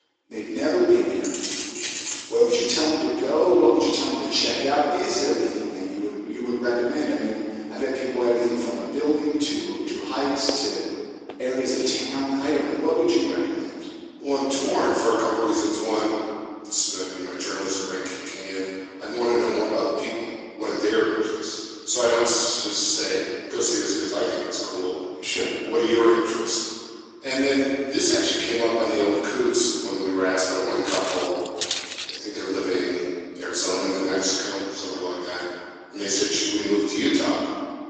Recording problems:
room echo; strong; dies away in 1.9 s
off-mic speech; far
thin; somewhat; fading below 300 Hz
garbled, watery; slightly; nothing above 7.5 kHz
jangling keys; noticeable; from 1 to 2.5 s; peak 4 dB below the speech
footsteps; noticeable; at 10 s and from 31 to 32 s; peak 2 dB below the speech

